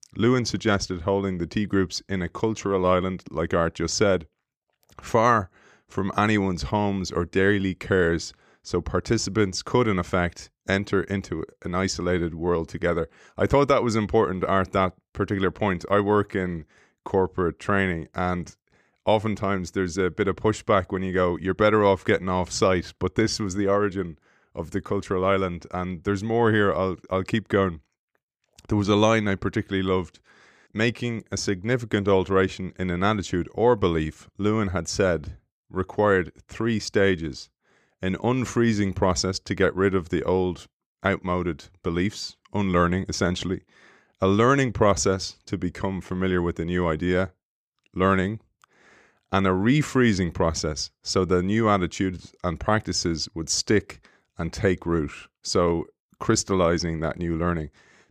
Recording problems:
none

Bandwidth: 15 kHz